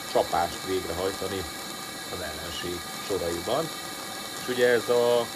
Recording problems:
hiss; loud; throughout; 6 dB below the speech

